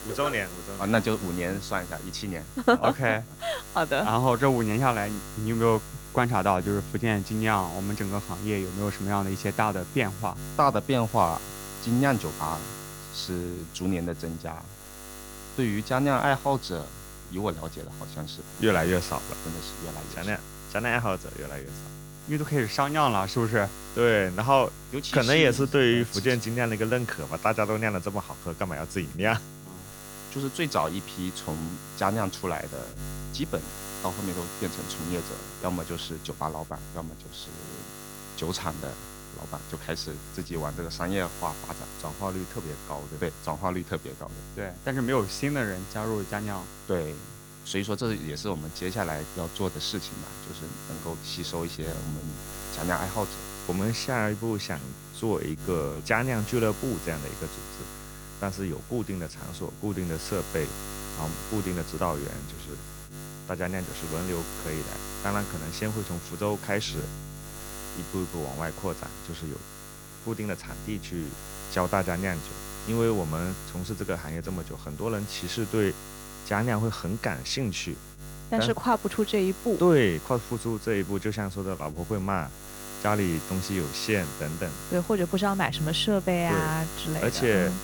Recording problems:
electrical hum; noticeable; throughout; 50 Hz, 15 dB below the speech

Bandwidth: 18.5 kHz